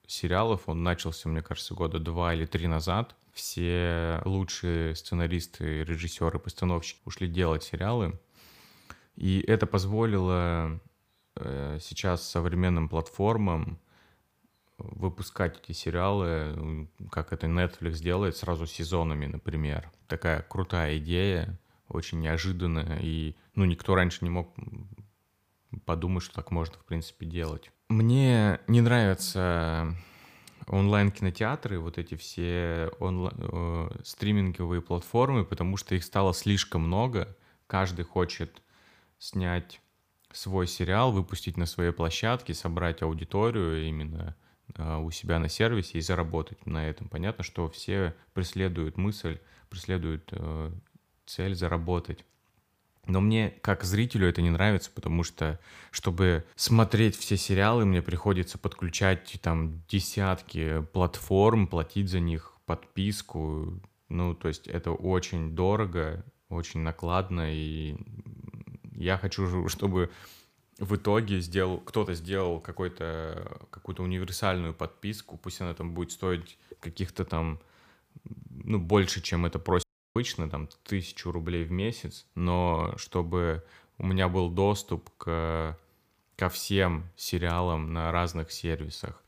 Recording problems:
audio cutting out; at 1:20

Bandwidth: 15 kHz